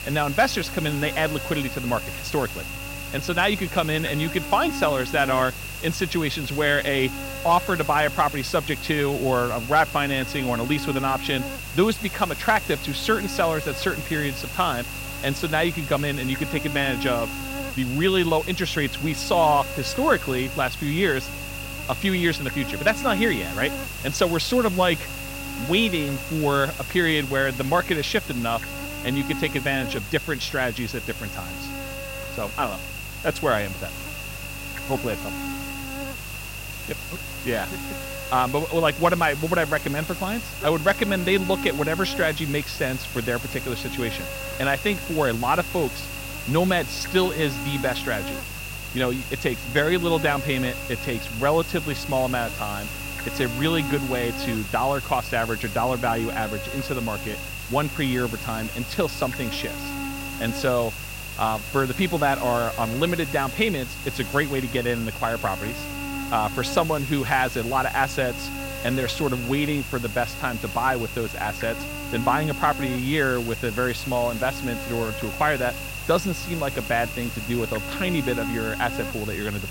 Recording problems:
electrical hum; loud; throughout; 50 Hz, 9 dB below the speech
hiss; noticeable; throughout; 15 dB below the speech

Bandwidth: 16 kHz